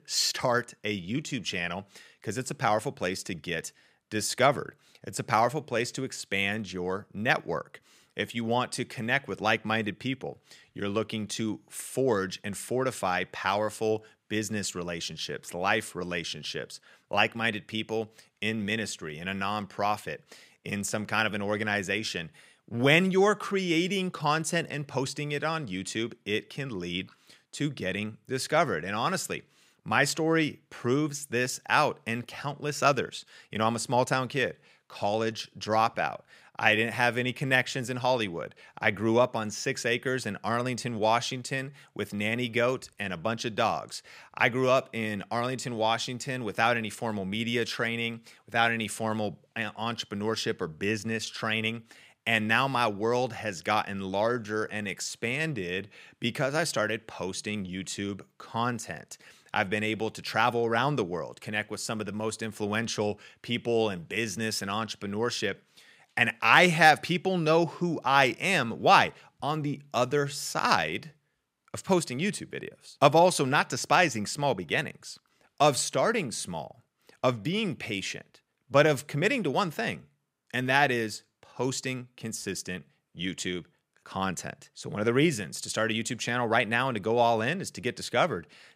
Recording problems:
none

